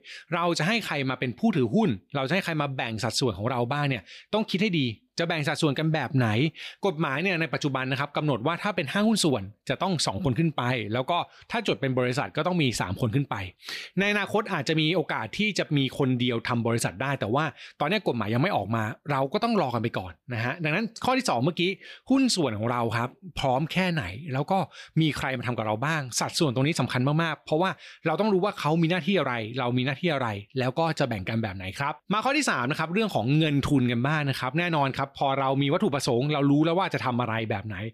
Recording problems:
none

